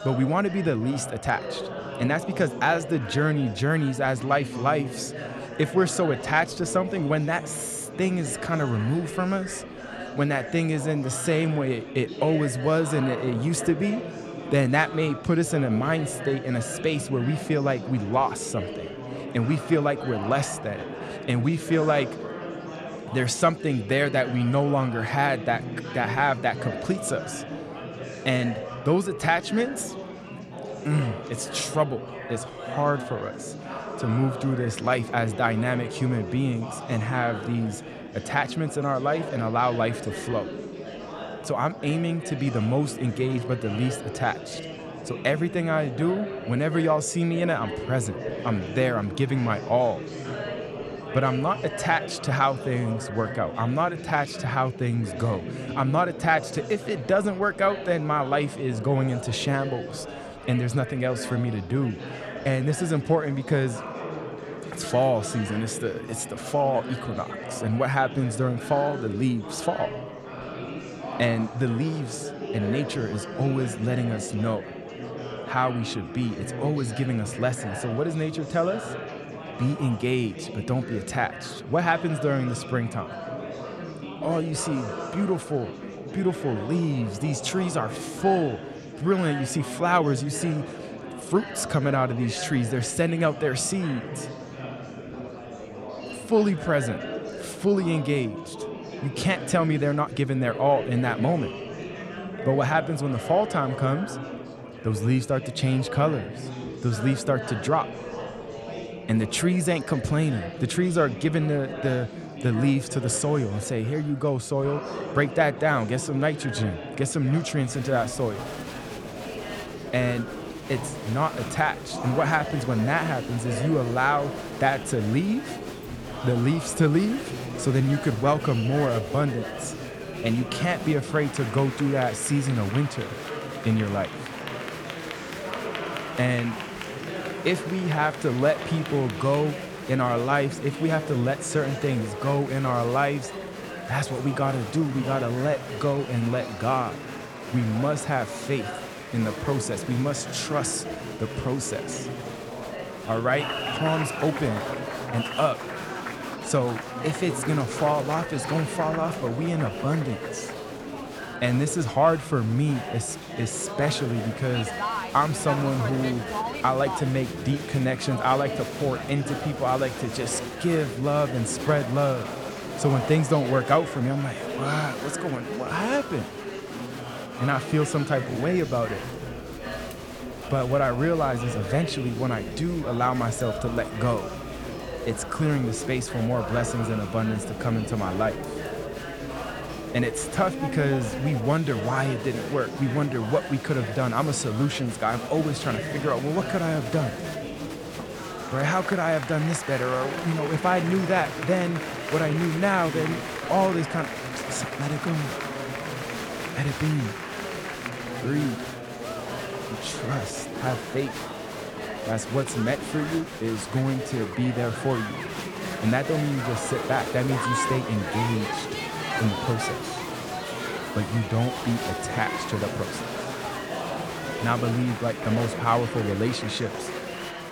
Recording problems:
murmuring crowd; loud; throughout; 8 dB below the speech

